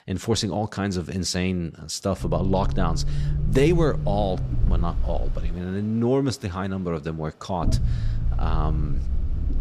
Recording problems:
low rumble; noticeable; from 2 to 5.5 s and from 7.5 s on; 15 dB below the speech
machinery noise; faint; throughout; 25 dB below the speech

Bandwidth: 14.5 kHz